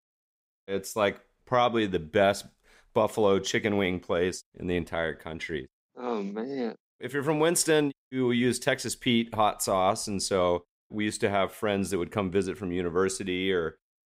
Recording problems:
none

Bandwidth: 15.5 kHz